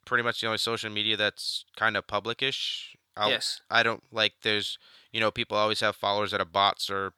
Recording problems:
thin; somewhat; fading below 1 kHz

